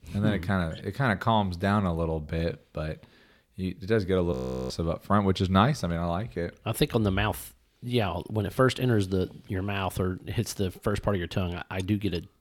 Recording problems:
audio freezing; at 4.5 s

